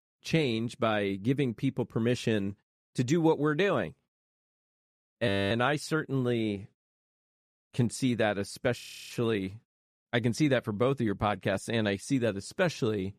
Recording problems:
audio freezing; at 5.5 s and at 9 s

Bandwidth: 14.5 kHz